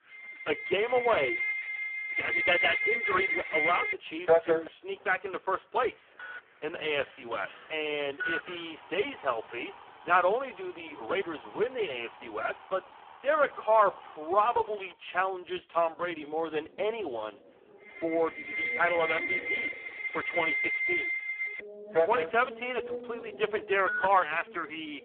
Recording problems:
phone-call audio; poor line
alarms or sirens; loud; throughout; 3 dB below the speech
traffic noise; noticeable; throughout; 15 dB below the speech

